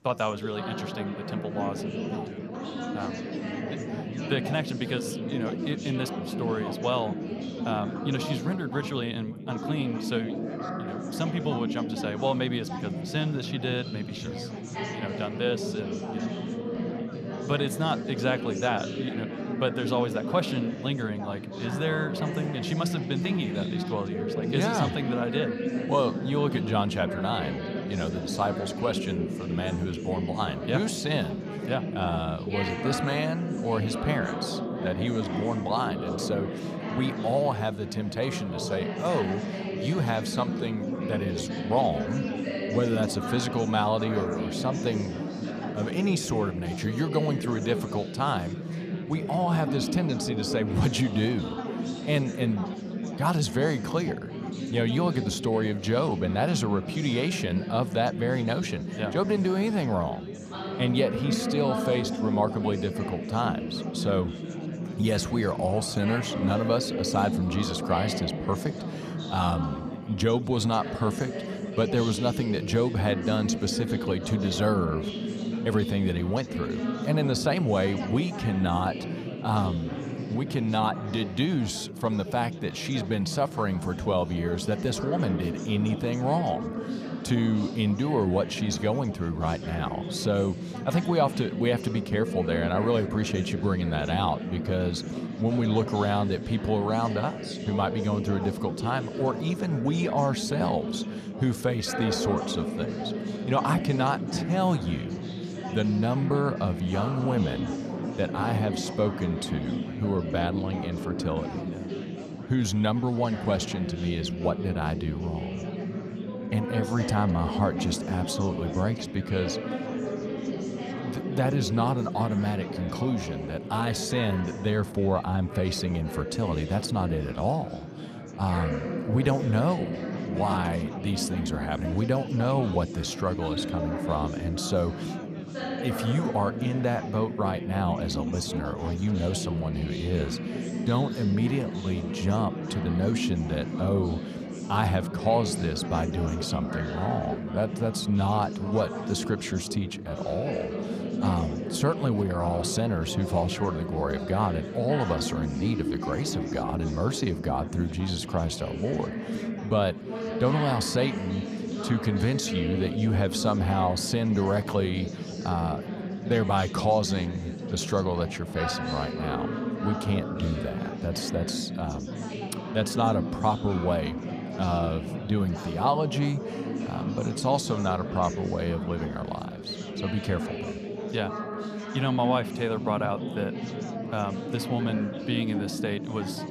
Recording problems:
chatter from many people; loud; throughout; 4 dB below the speech

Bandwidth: 15 kHz